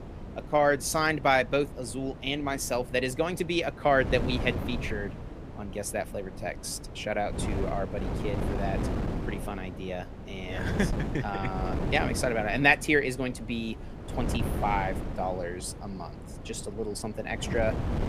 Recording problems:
wind noise on the microphone; occasional gusts; 10 dB below the speech

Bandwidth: 15 kHz